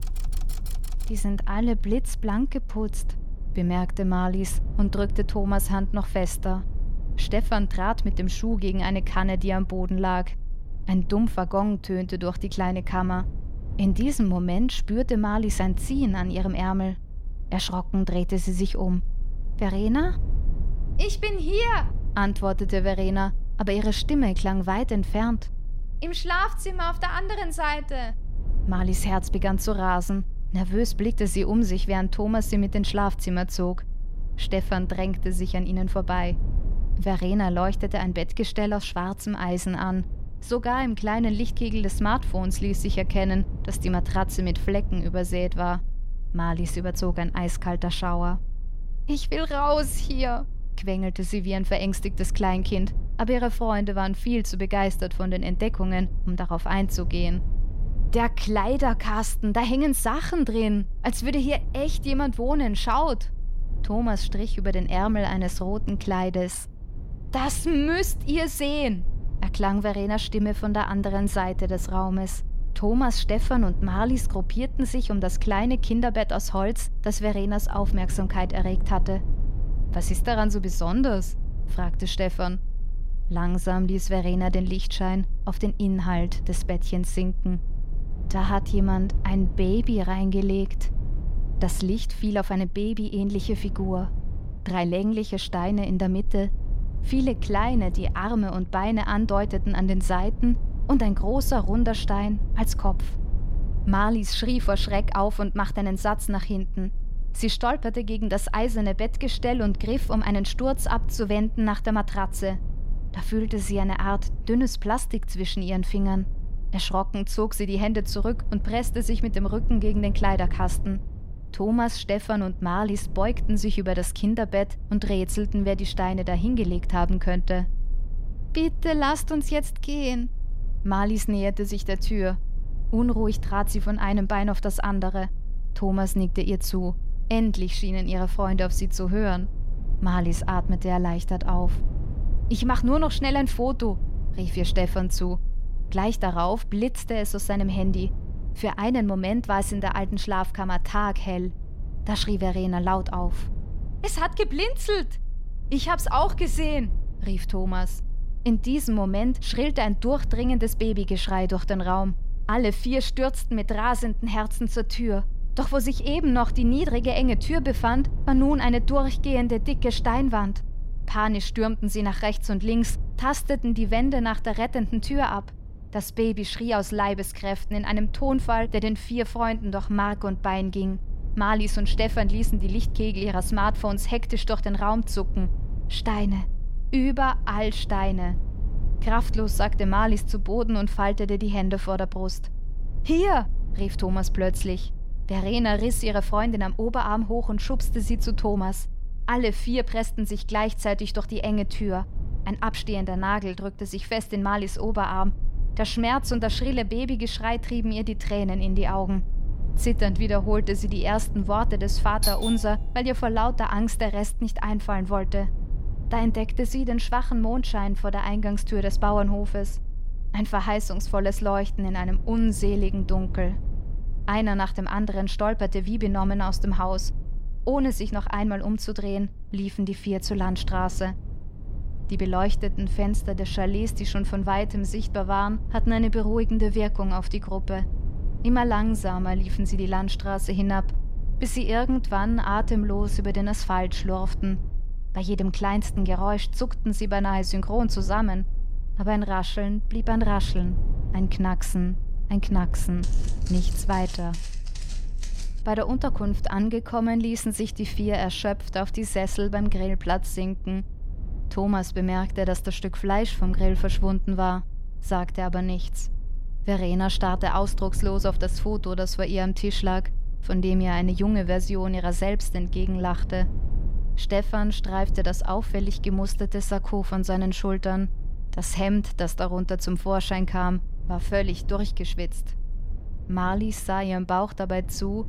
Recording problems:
low rumble; faint; throughout; 20 dB below the speech
keyboard typing; faint; until 1.5 s; peak 15 dB below the speech
doorbell; loud; at 3:32; peak level with the speech
footsteps; faint; from 4:13 to 4:16; peak 15 dB below the speech

